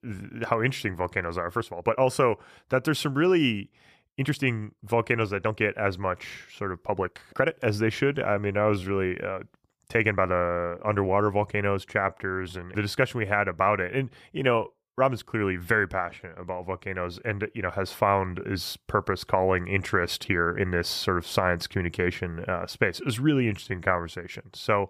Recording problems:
uneven, jittery; strongly; from 1.5 to 24 s

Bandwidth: 15 kHz